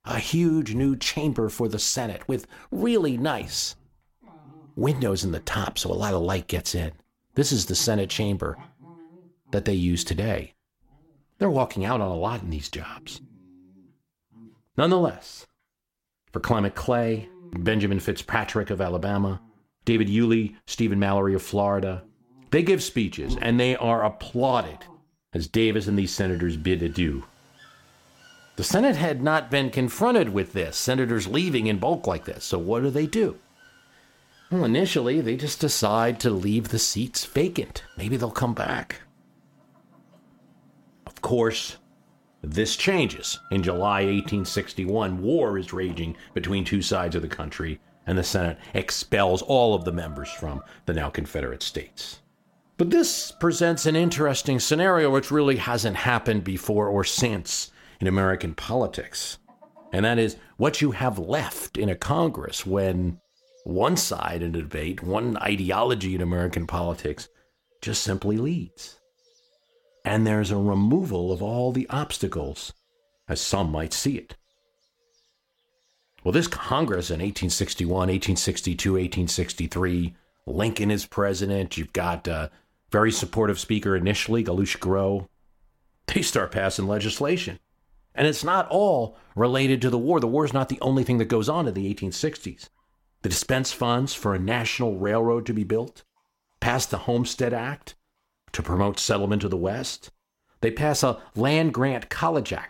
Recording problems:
animal sounds; faint; throughout; 25 dB below the speech

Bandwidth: 16.5 kHz